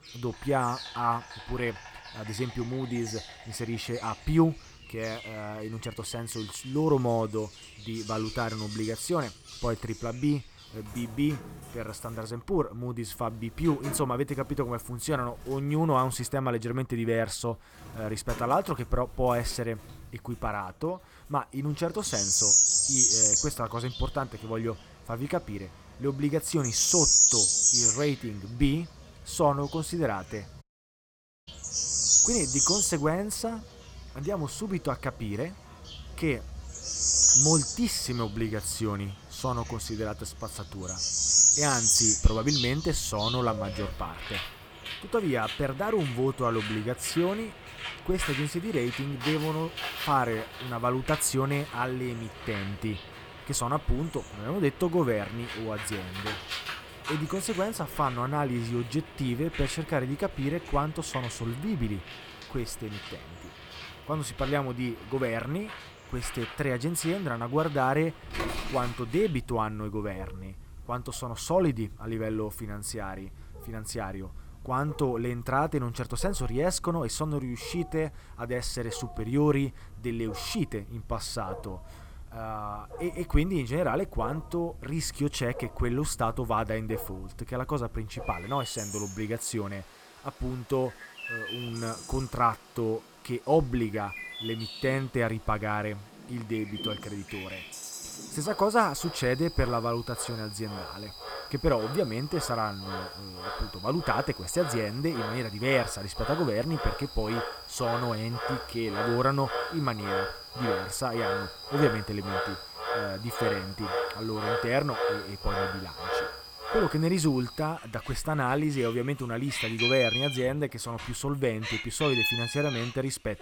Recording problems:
animal sounds; very loud; throughout; 2 dB above the speech
audio cutting out; at 31 s for 1 s

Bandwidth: 18.5 kHz